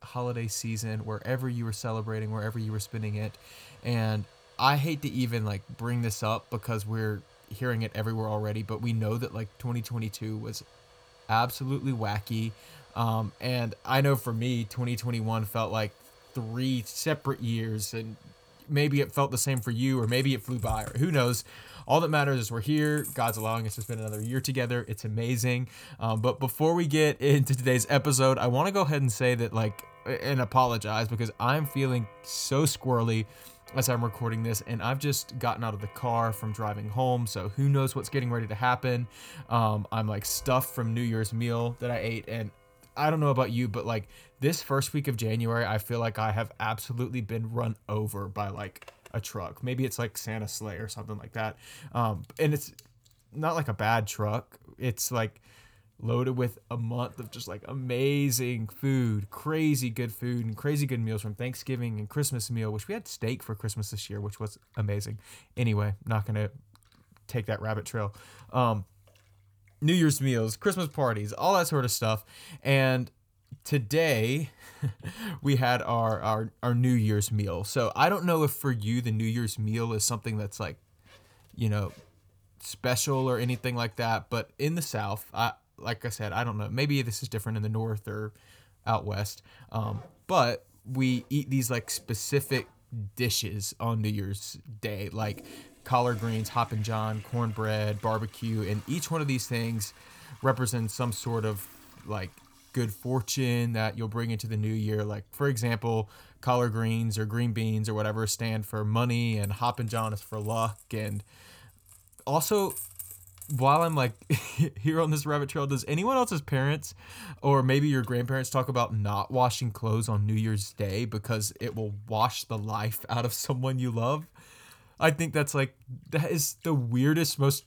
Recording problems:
household noises; faint; throughout; 20 dB below the speech

